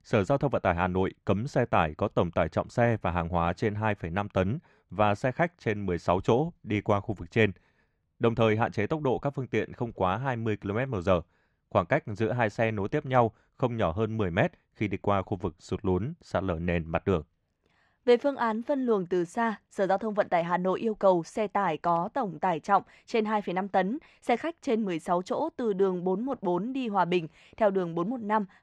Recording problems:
muffled; slightly; fading above 3.5 kHz

